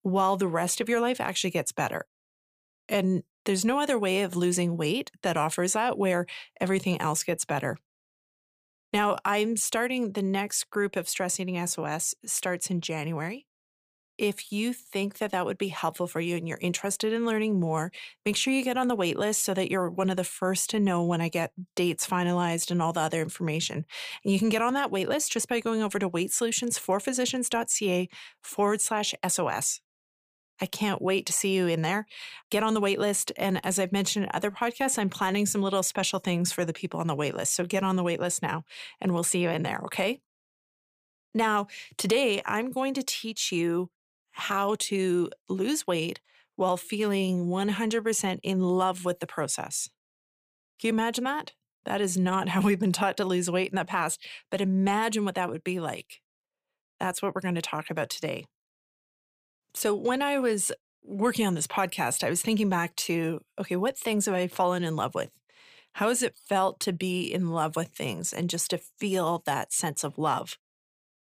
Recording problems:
none

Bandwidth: 15 kHz